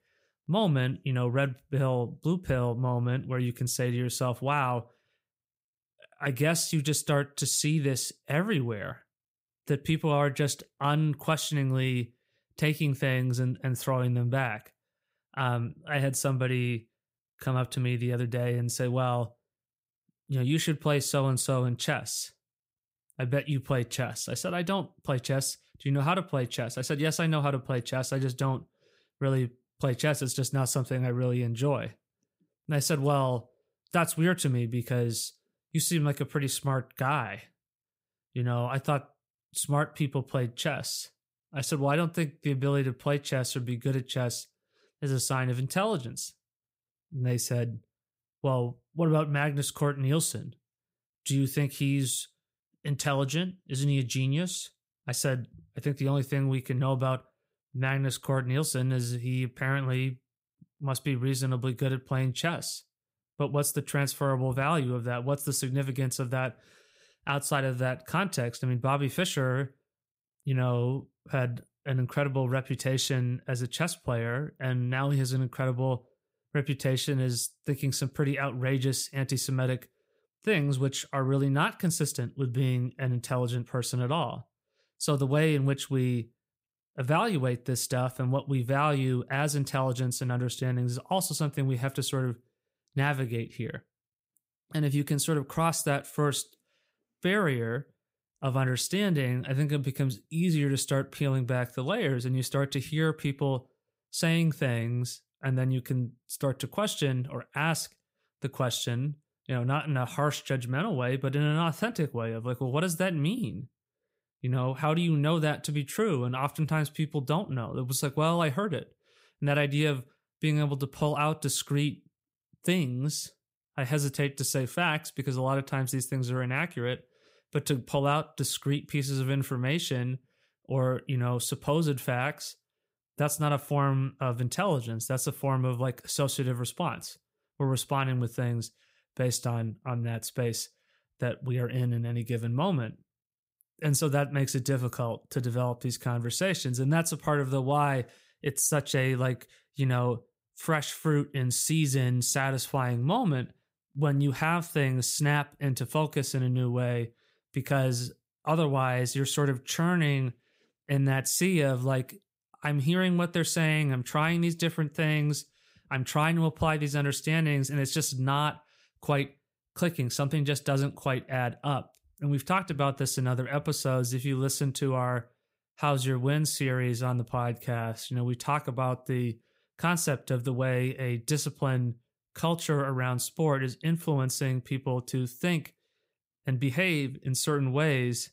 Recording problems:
none

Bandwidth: 15.5 kHz